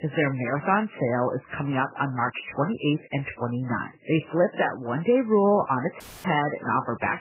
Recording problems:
garbled, watery; badly; nothing above 3 kHz
audio cutting out; filled with static; at 6 s

